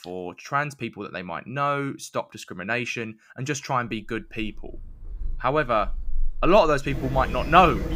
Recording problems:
animal sounds; noticeable; from 4.5 s on; 10 dB below the speech

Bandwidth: 15.5 kHz